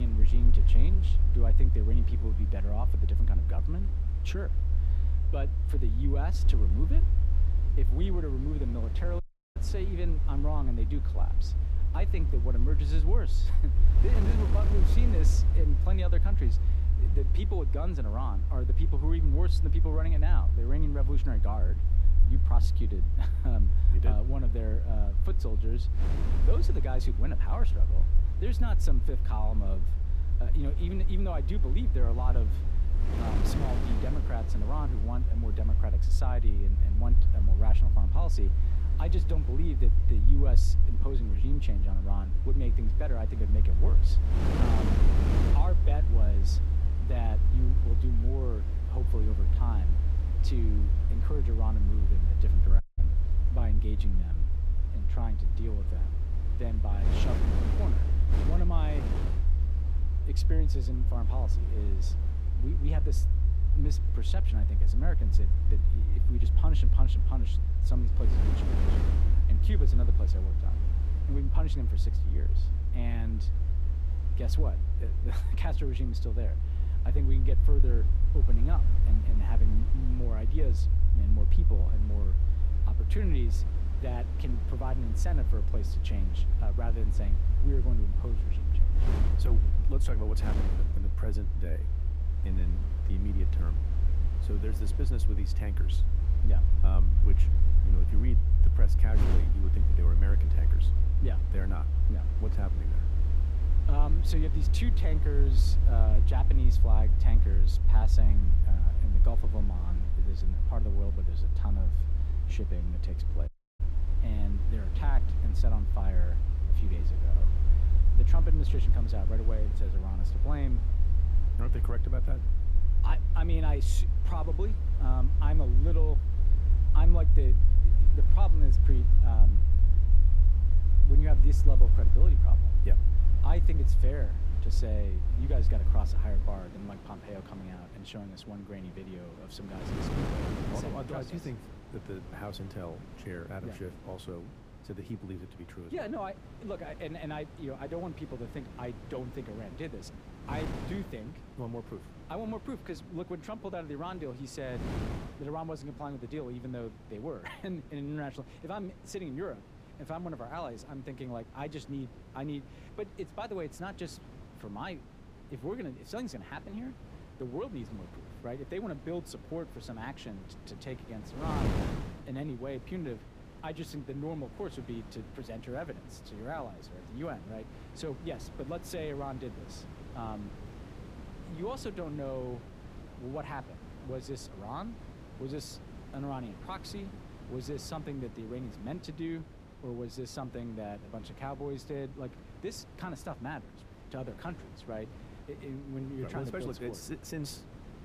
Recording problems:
wind noise on the microphone; heavy; 7 dB below the speech
low rumble; loud; until 2:17; 6 dB below the speech
abrupt cut into speech; at the start
audio cutting out; at 9 s, at 53 s and at 1:53

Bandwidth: 15 kHz